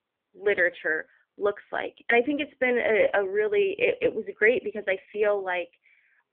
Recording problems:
phone-call audio; poor line; nothing above 3.5 kHz

